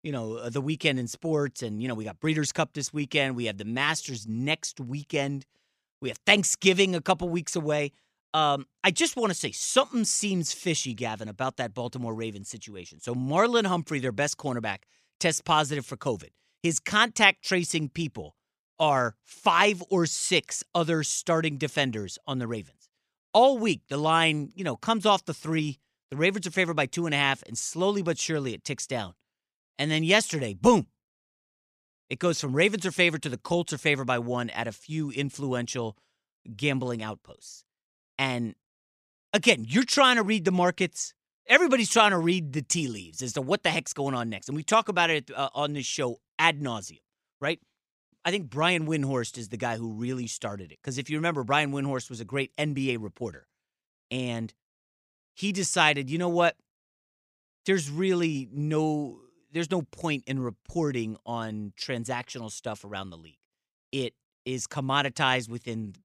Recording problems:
none

